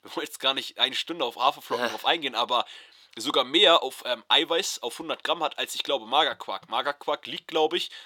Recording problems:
thin; somewhat; fading below 500 Hz

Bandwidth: 17.5 kHz